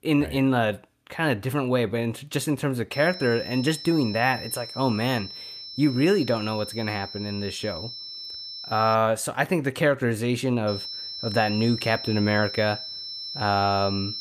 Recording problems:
high-pitched whine; loud; from 3 to 9 s and from 11 s on; 5.5 kHz, 9 dB below the speech

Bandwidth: 14.5 kHz